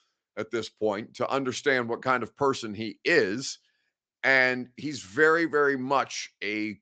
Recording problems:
high frequencies cut off; noticeable; nothing above 8 kHz

